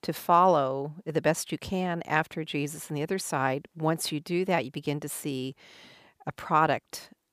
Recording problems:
none

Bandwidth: 15 kHz